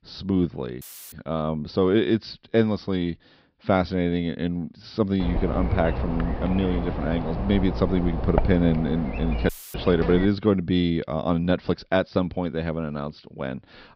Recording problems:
high frequencies cut off; noticeable; nothing above 5.5 kHz
electrical hum; loud; from 5 to 10 s; 60 Hz, 7 dB below the speech
audio cutting out; filled with static; at 1 s and at 9.5 s

